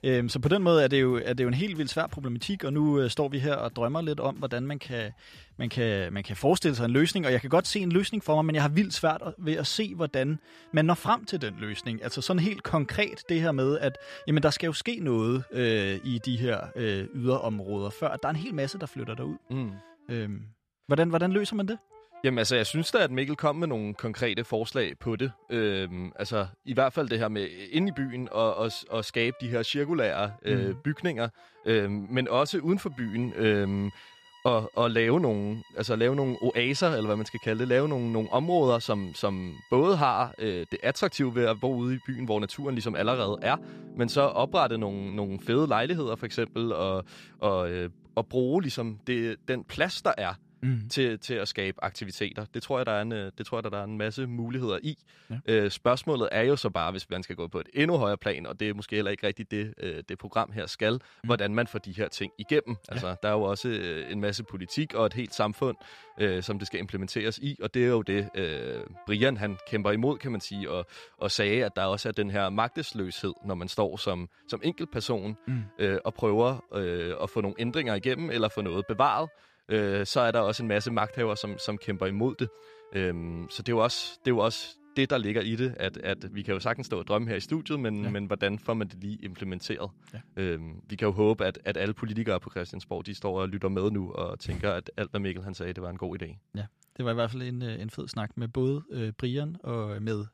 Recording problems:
background music; faint; throughout; 25 dB below the speech

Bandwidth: 14.5 kHz